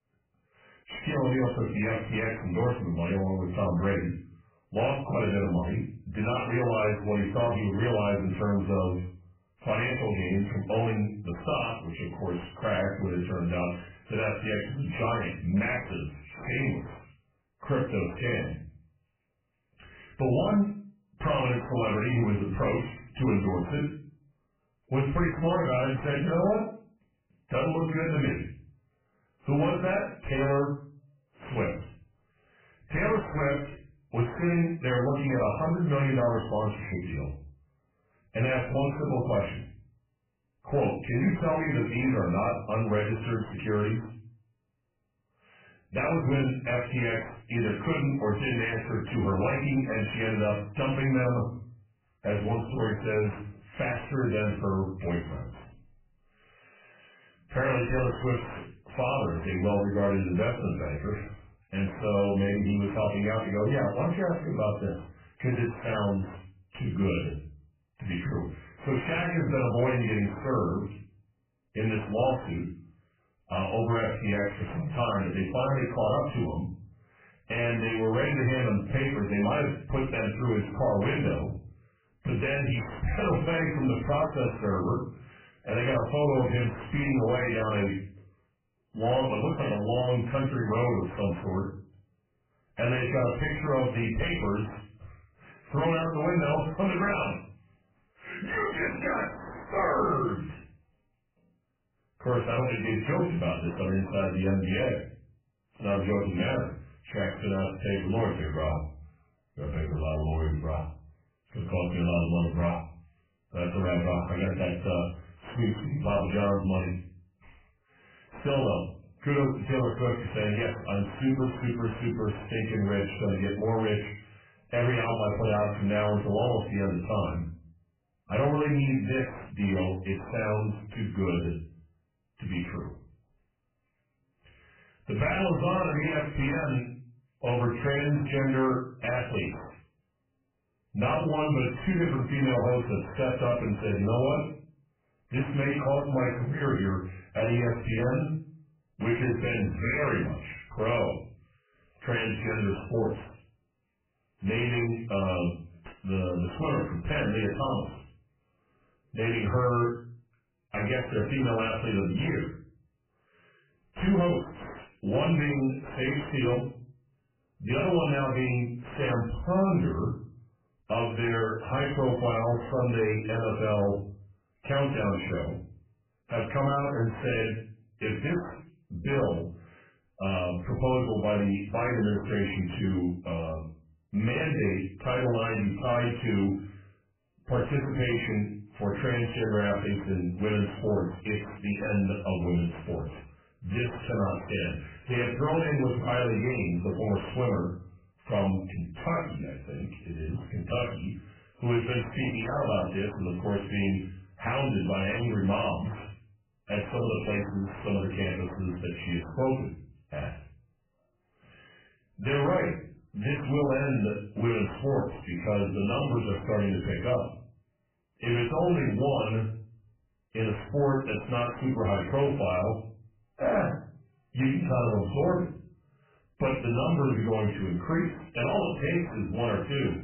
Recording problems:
off-mic speech; far
garbled, watery; badly; nothing above 2.5 kHz
room echo; slight; dies away in 0.4 s
distortion; slight; 9 dB below the speech

